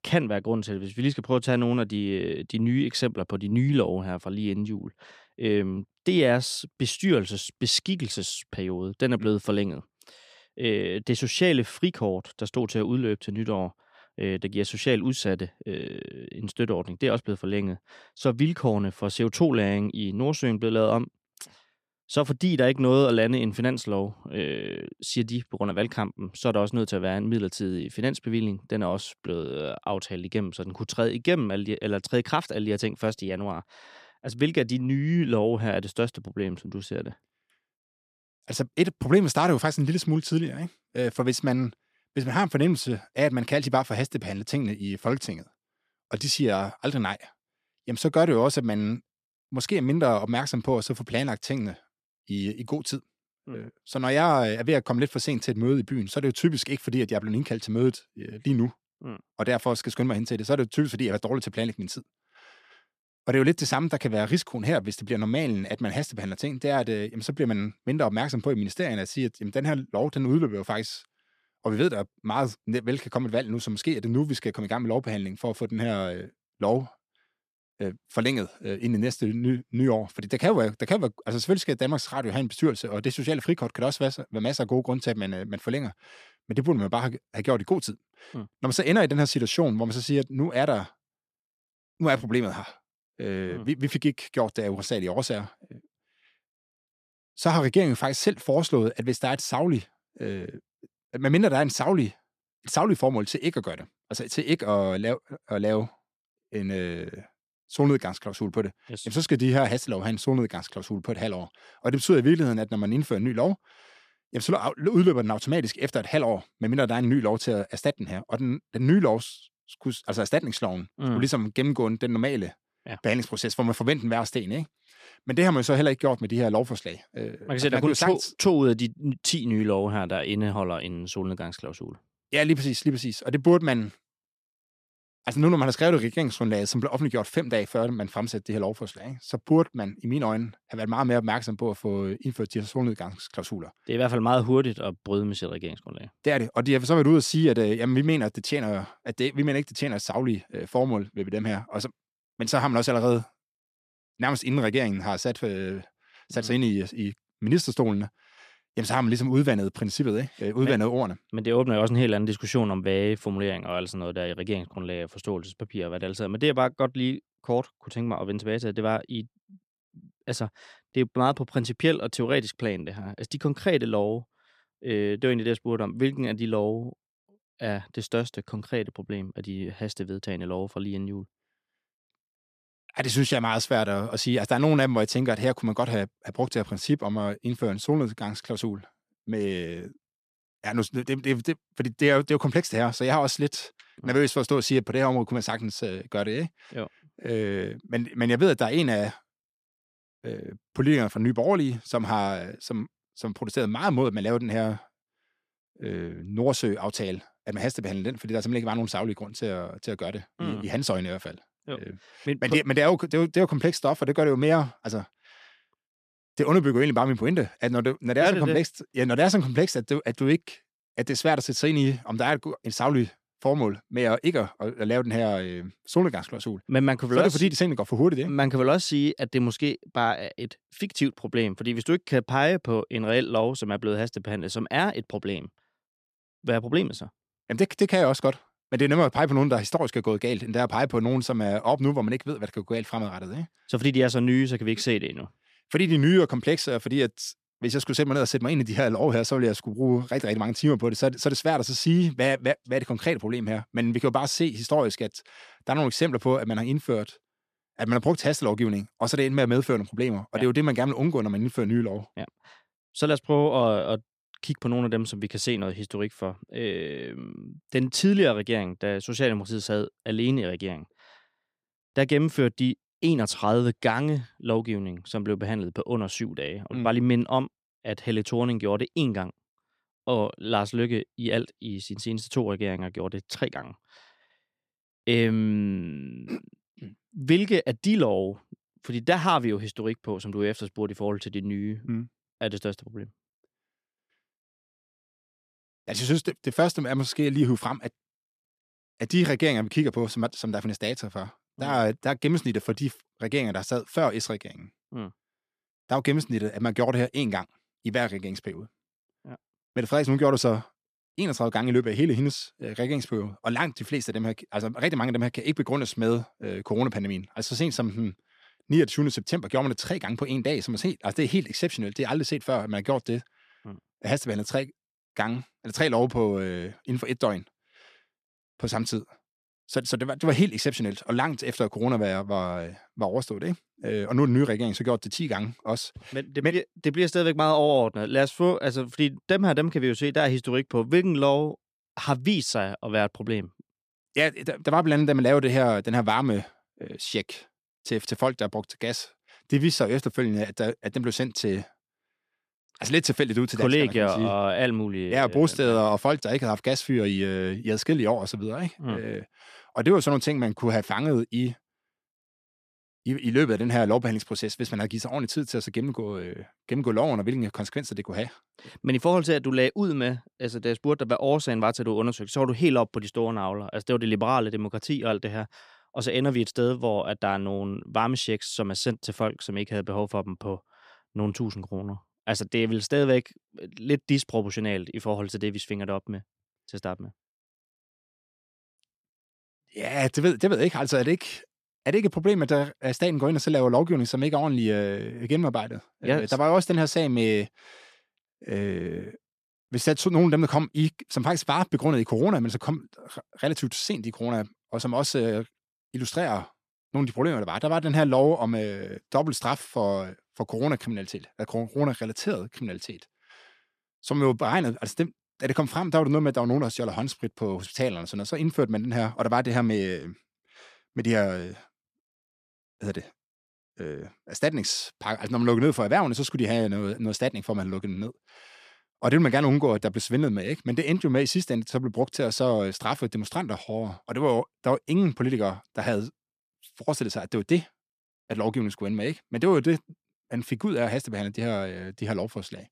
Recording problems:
none

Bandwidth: 14.5 kHz